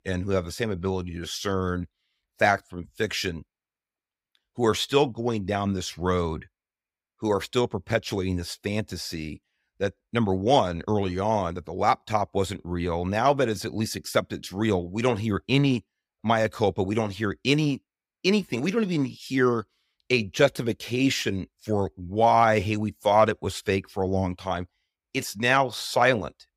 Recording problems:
none

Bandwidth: 15.5 kHz